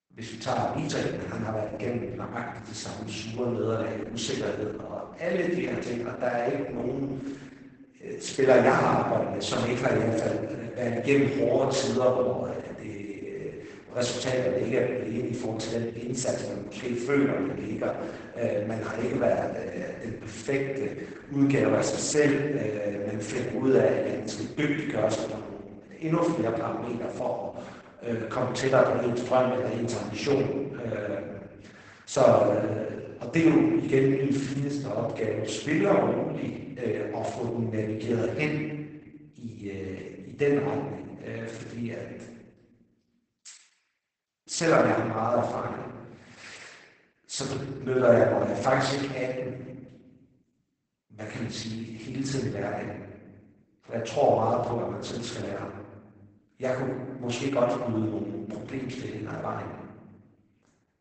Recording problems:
off-mic speech; far
garbled, watery; badly; nothing above 8 kHz
room echo; noticeable; dies away in 1.2 s
thin; very slightly; fading below 550 Hz

